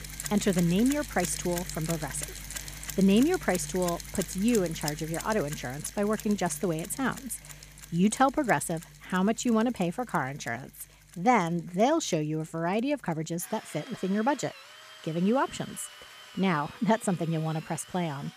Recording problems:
machinery noise; noticeable; throughout; 10 dB below the speech

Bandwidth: 14.5 kHz